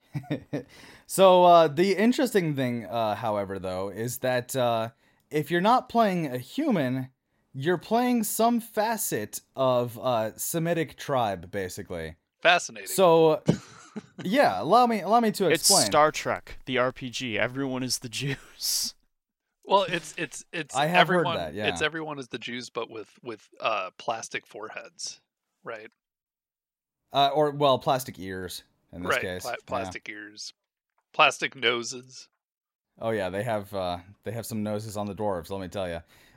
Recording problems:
none

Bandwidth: 16 kHz